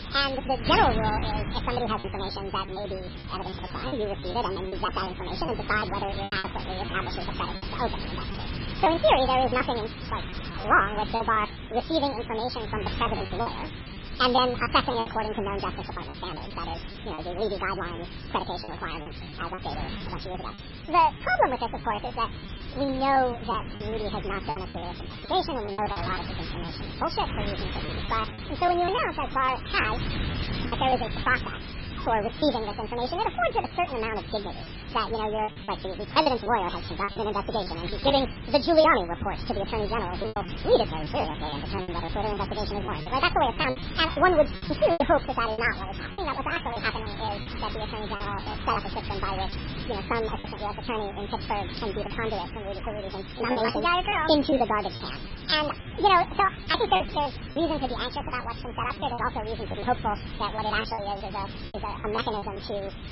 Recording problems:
garbled, watery; badly; nothing above 5.5 kHz
wrong speed and pitch; too fast and too high; 1.7 times normal speed
wind noise on the microphone; occasional gusts; 15 dB below the speech
hiss; faint; throughout; 25 dB below the speech
choppy; very; 9% of the speech affected

